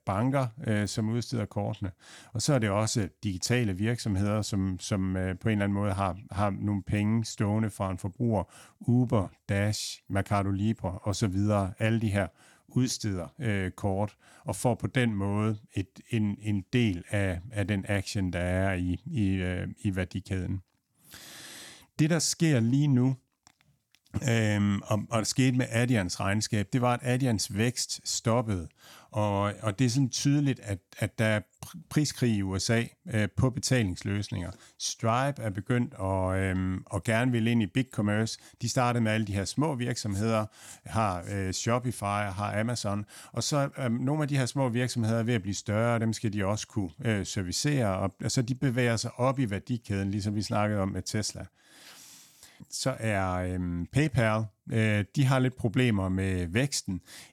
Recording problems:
none

